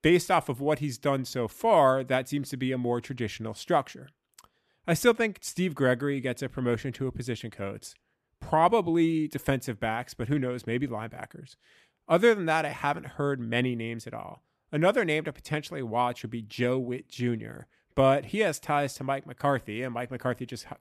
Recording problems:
none

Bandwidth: 14 kHz